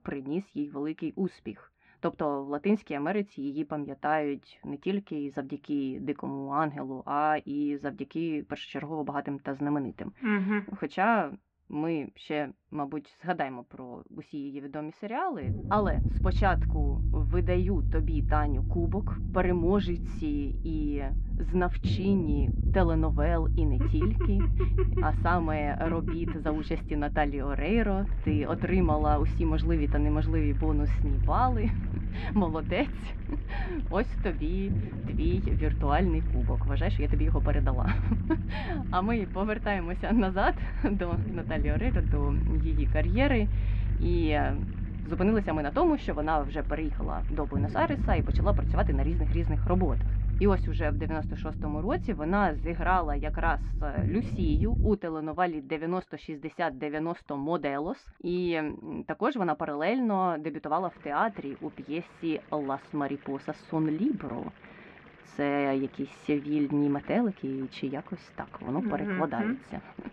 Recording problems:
muffled; very; fading above 2.5 kHz
low rumble; noticeable; from 15 to 55 s; 15 dB below the speech
household noises; faint; throughout; 25 dB below the speech

